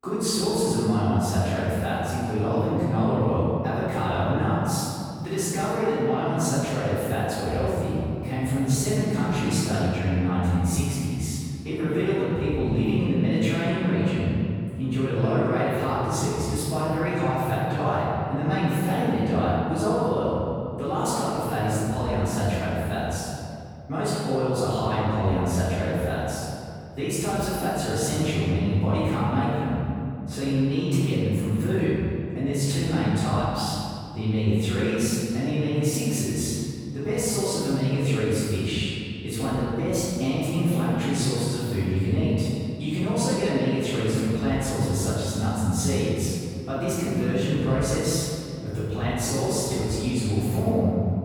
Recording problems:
room echo; strong; dies away in 2.4 s
off-mic speech; far

